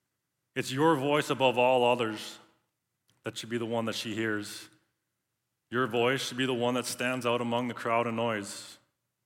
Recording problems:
none

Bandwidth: 16.5 kHz